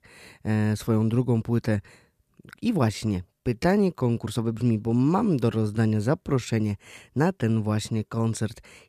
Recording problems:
uneven, jittery; strongly; from 1.5 to 8.5 s

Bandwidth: 14.5 kHz